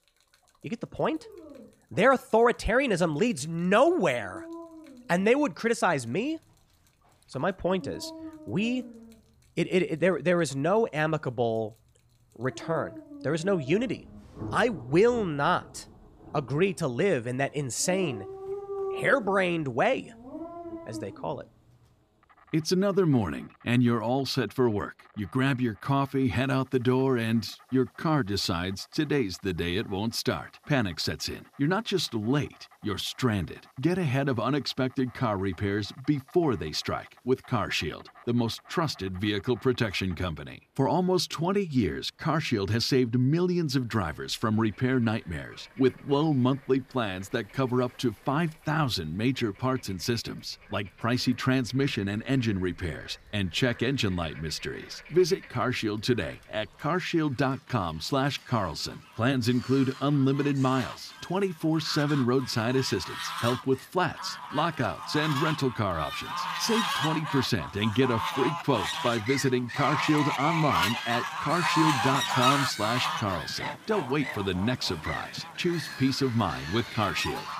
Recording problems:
animal sounds; loud; throughout; 6 dB below the speech
rain or running water; faint; throughout; 30 dB below the speech

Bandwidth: 15 kHz